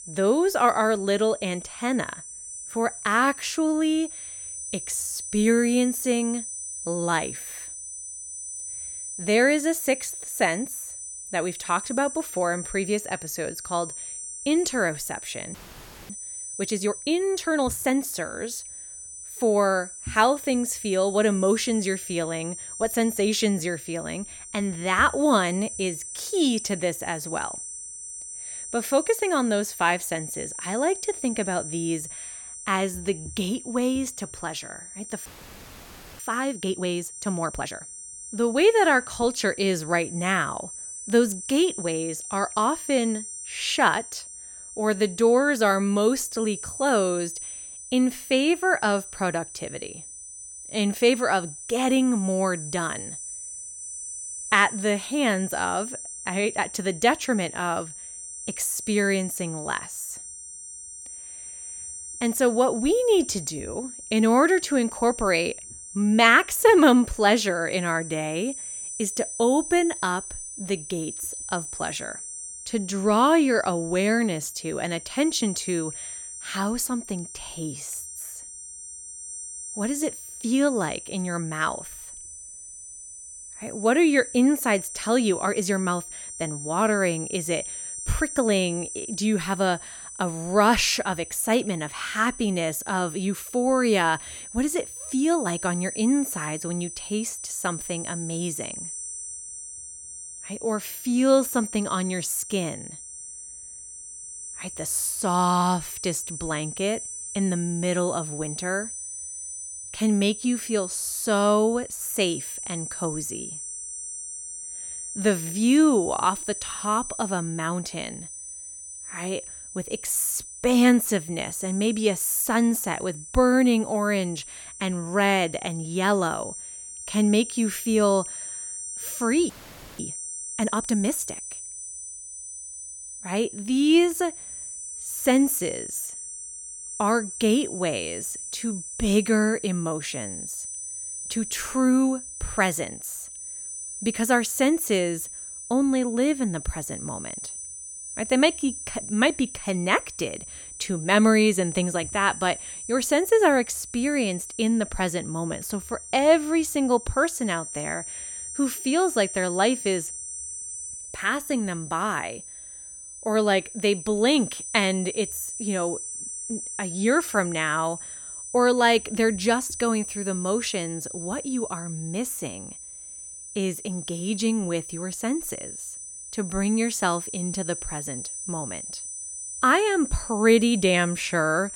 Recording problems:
high-pitched whine; loud; throughout; 9 kHz, 10 dB below the speech
audio freezing; at 16 s for 0.5 s, at 35 s for 1 s and at 2:09 for 0.5 s

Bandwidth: 17 kHz